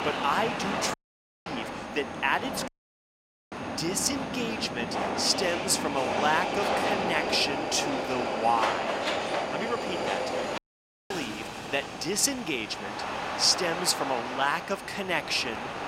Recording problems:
thin; somewhat; fading below 700 Hz
train or aircraft noise; loud; throughout; 3 dB below the speech
wind noise on the microphone; occasional gusts; 15 dB below the speech
high-pitched whine; faint; throughout; 6.5 kHz, 30 dB below the speech
audio cutting out; at 1 s for 0.5 s, at 2.5 s for 1 s and at 11 s for 0.5 s

